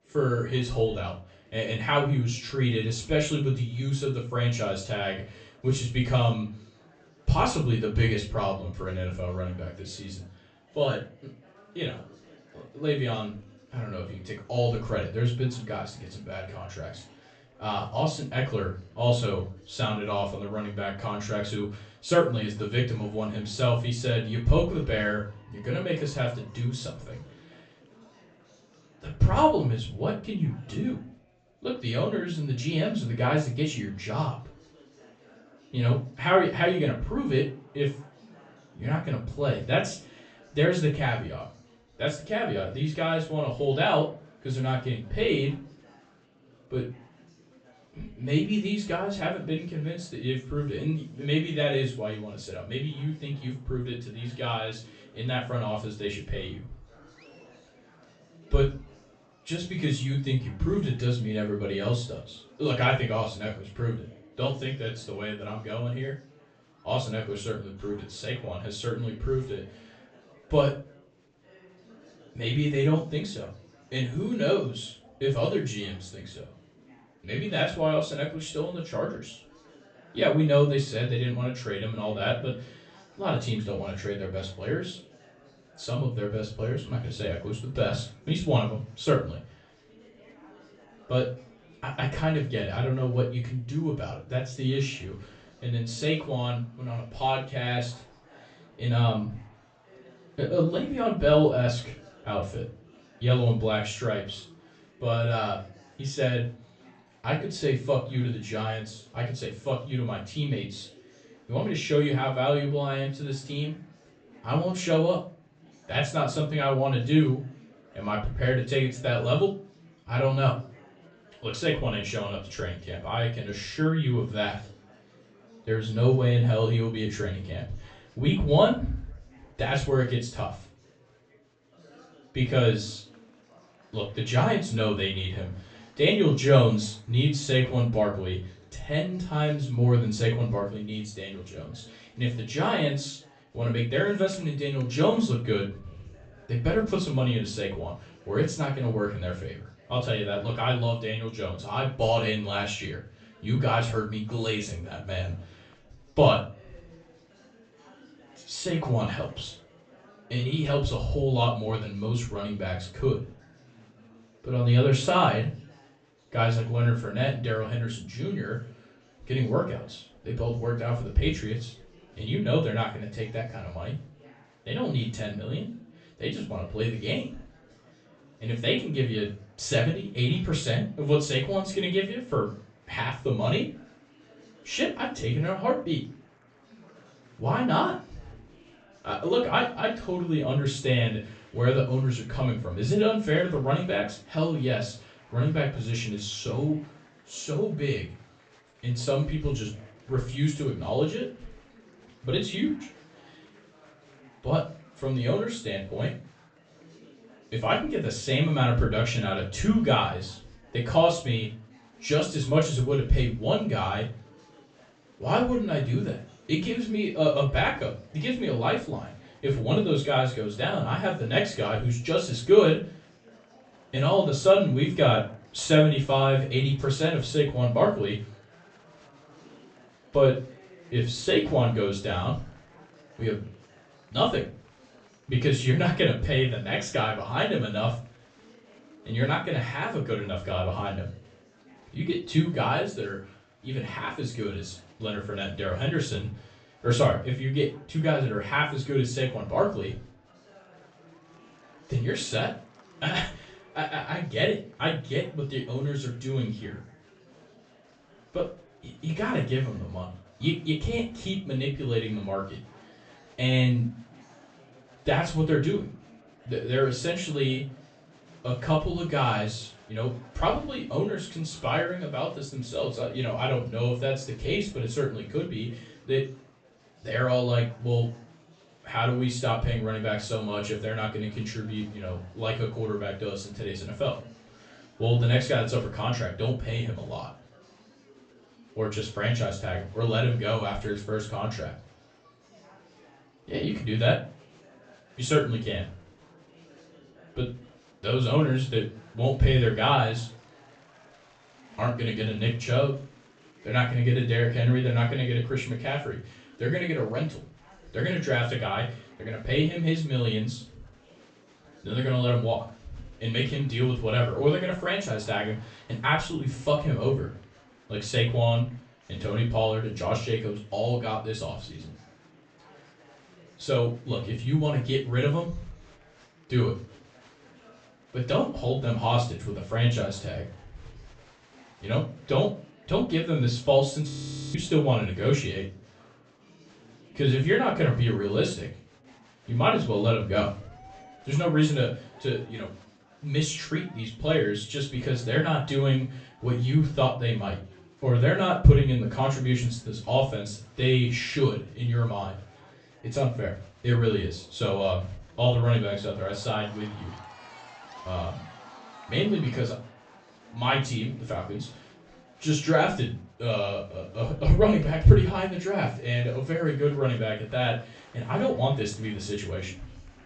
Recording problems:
off-mic speech; far
high frequencies cut off; noticeable; nothing above 8 kHz
room echo; slight; dies away in 0.3 s
chatter from many people; faint; throughout; 25 dB below the speech
audio freezing; at 5:34

